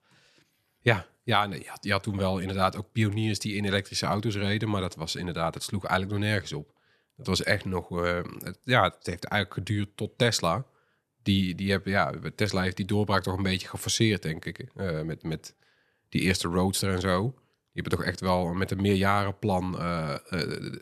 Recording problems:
none

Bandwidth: 13.5 kHz